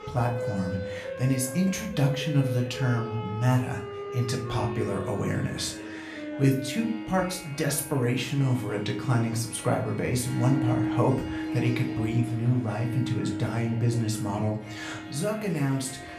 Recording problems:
room echo; slight; dies away in 0.4 s
off-mic speech; somewhat distant
background music; loud; throughout; 8 dB below the speech
chatter from many people; noticeable; throughout; 20 dB below the speech

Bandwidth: 14.5 kHz